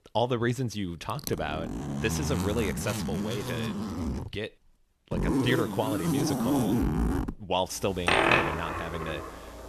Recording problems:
household noises; very loud; throughout; 2 dB above the speech

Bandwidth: 13.5 kHz